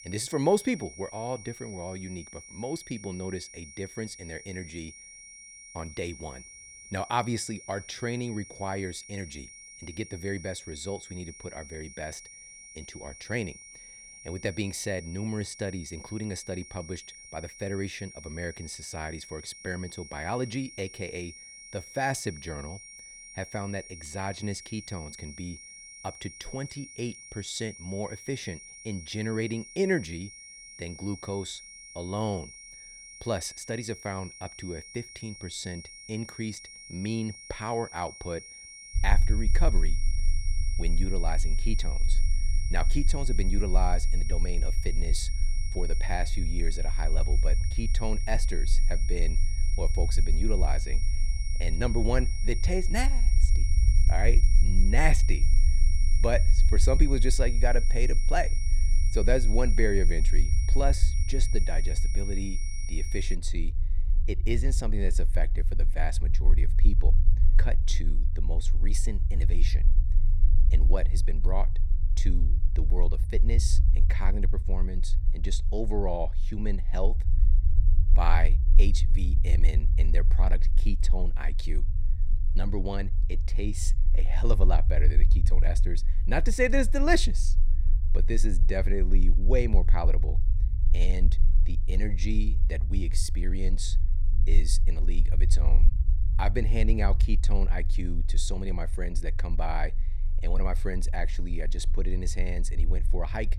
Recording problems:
high-pitched whine; loud; until 1:03; 5.5 kHz, 9 dB below the speech
low rumble; noticeable; from 39 s on; 15 dB below the speech

